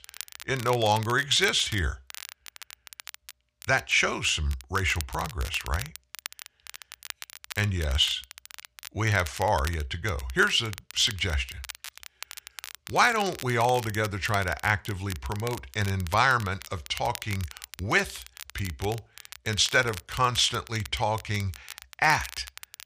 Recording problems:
crackle, like an old record; noticeable; 15 dB below the speech

